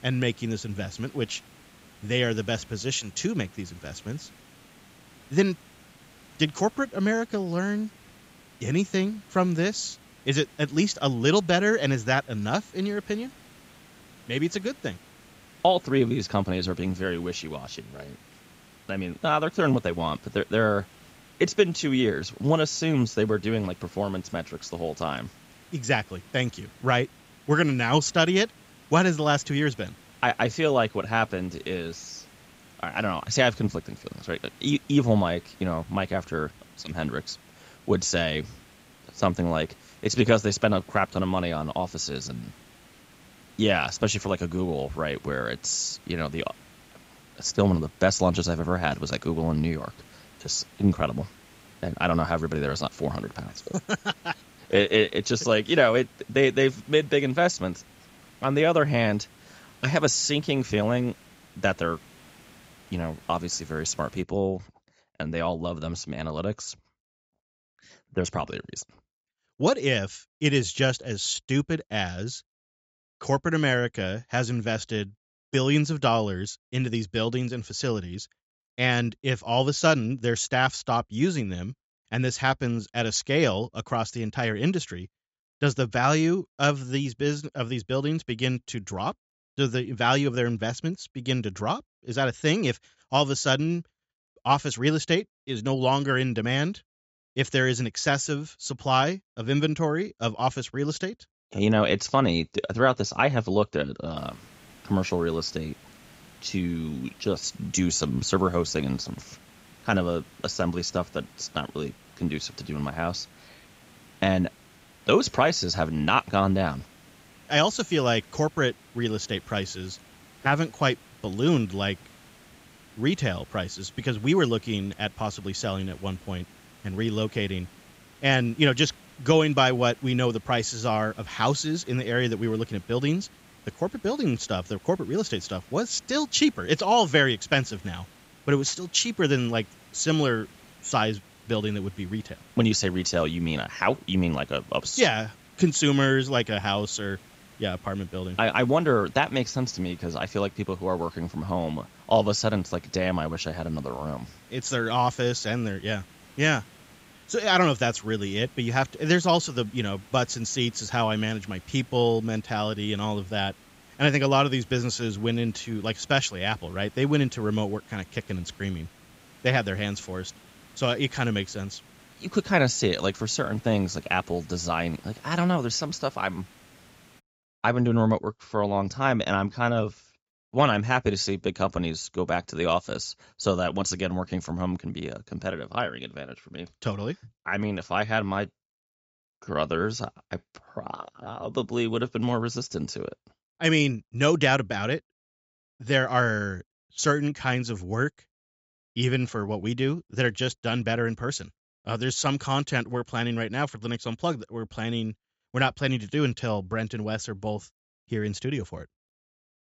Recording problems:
high frequencies cut off; noticeable; nothing above 8 kHz
hiss; faint; until 1:04 and from 1:44 to 2:57; 25 dB below the speech

